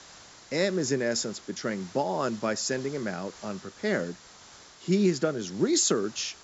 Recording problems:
high frequencies cut off; noticeable; nothing above 8 kHz
hiss; noticeable; throughout; 20 dB below the speech

